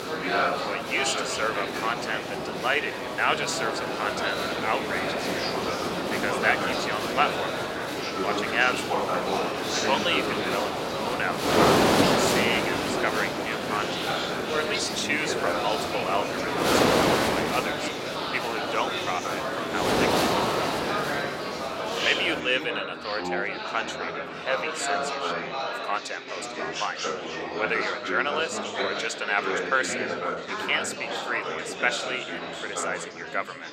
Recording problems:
thin; somewhat; fading below 500 Hz
wind noise on the microphone; heavy; until 22 s; 1 dB below the speech
chatter from many people; loud; throughout; 1 dB below the speech

